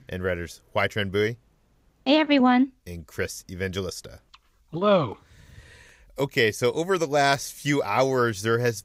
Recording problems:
none

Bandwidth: 15.5 kHz